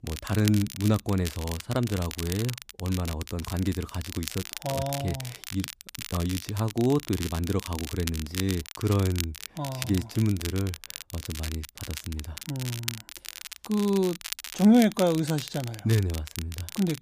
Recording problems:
crackle, like an old record; loud; 10 dB below the speech

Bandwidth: 15 kHz